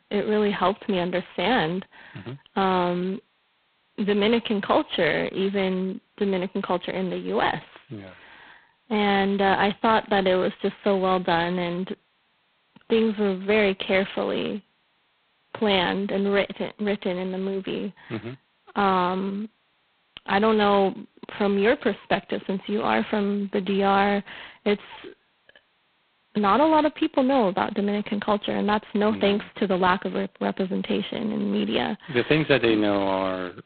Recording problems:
phone-call audio; poor line; nothing above 4 kHz

